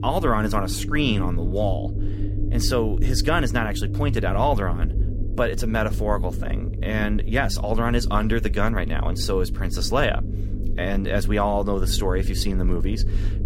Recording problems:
low rumble; noticeable; throughout; 15 dB below the speech

